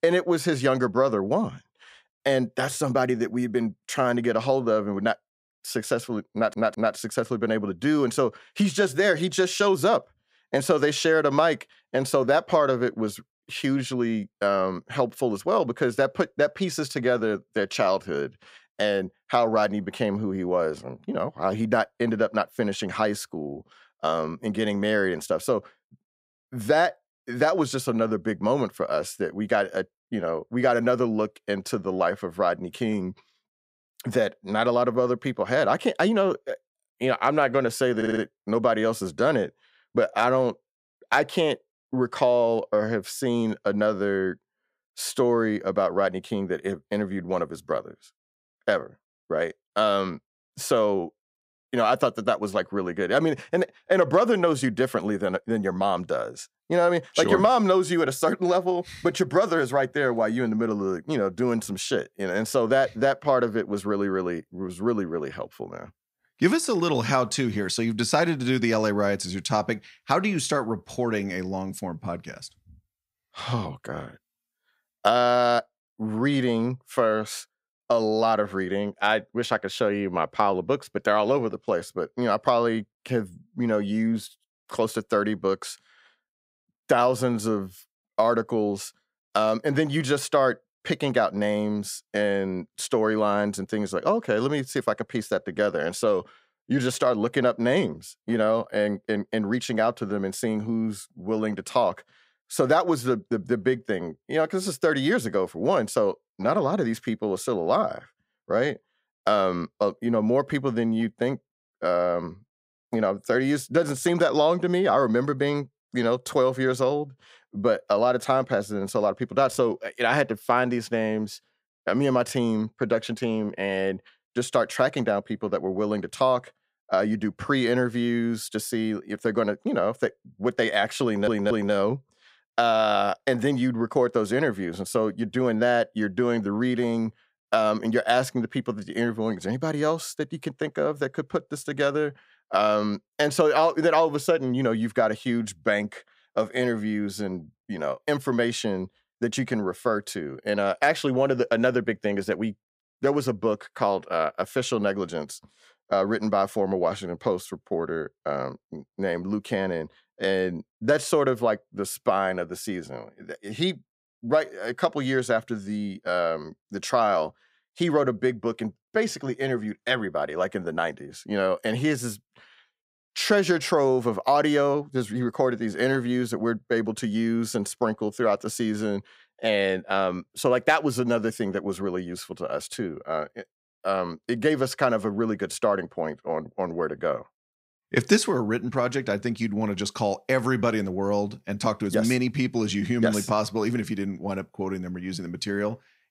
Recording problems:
audio stuttering; at 6.5 s, at 38 s and at 2:11

